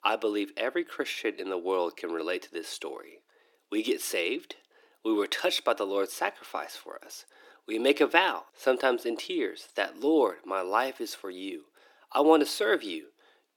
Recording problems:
thin; somewhat; fading below 300 Hz

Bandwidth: 18 kHz